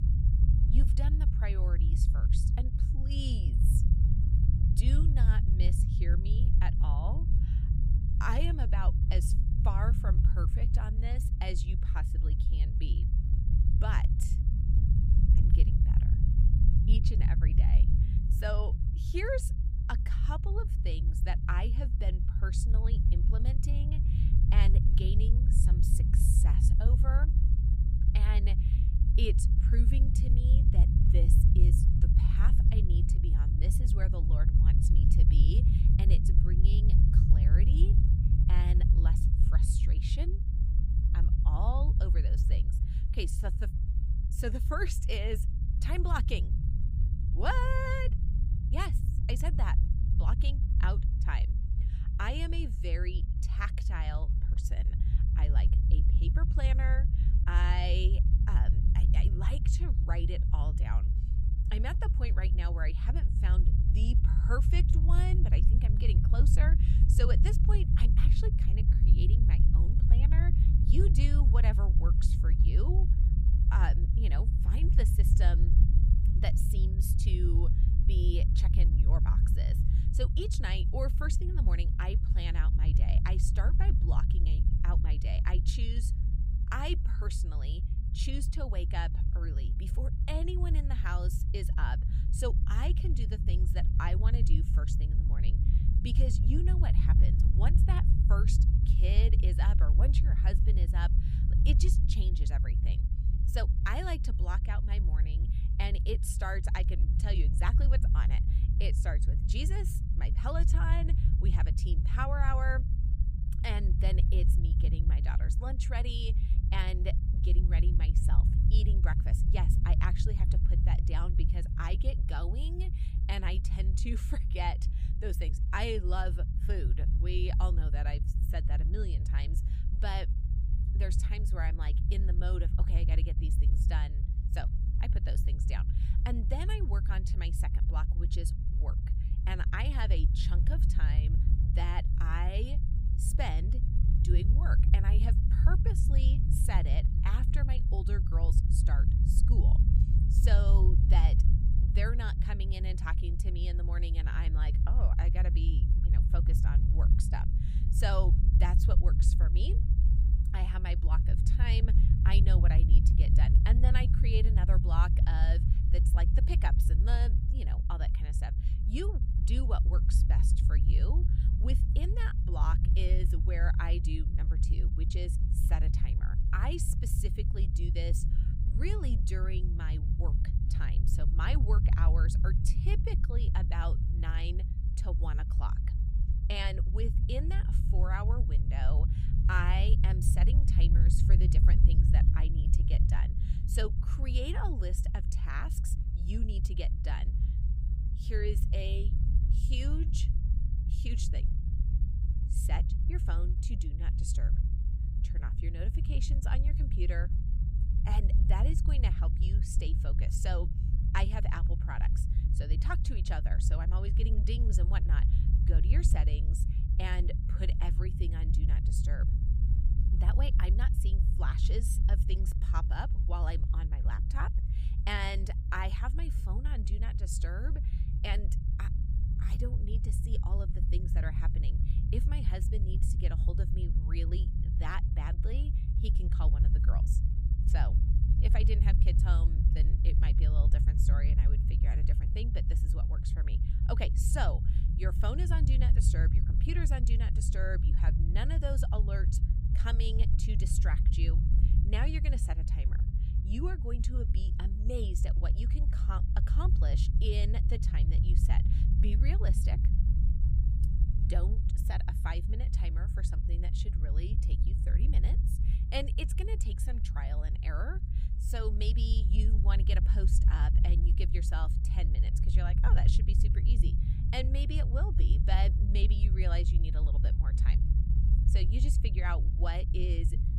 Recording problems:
low rumble; loud; throughout; 5 dB below the speech

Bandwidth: 15.5 kHz